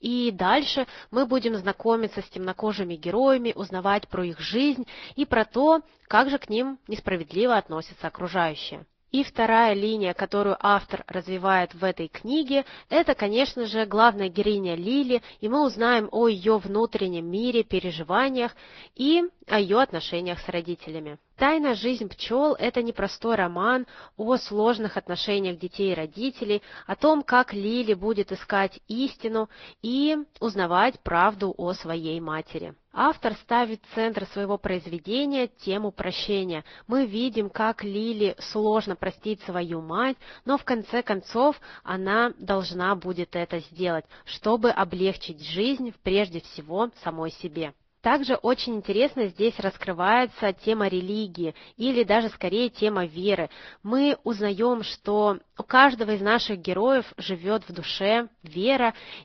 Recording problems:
high frequencies cut off; noticeable; nothing above 5.5 kHz
garbled, watery; slightly

